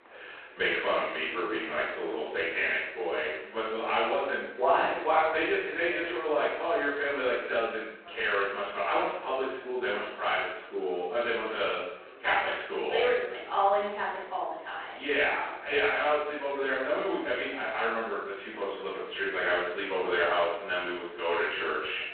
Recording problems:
phone-call audio; poor line
off-mic speech; far
room echo; noticeable; dies away in 0.8 s
chatter from many people; faint; throughout; 20 dB below the speech

